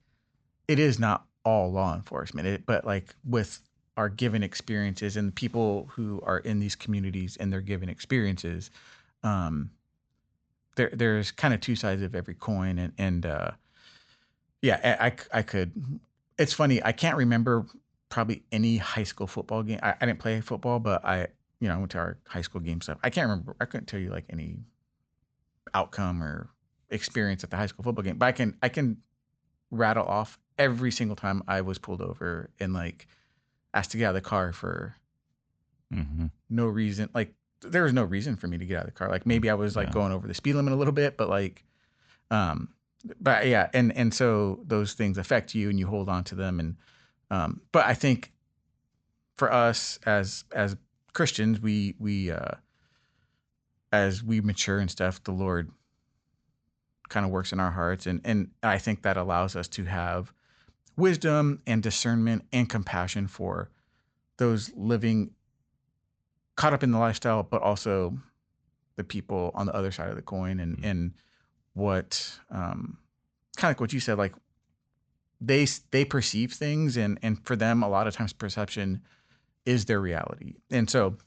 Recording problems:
high frequencies cut off; noticeable; nothing above 8 kHz

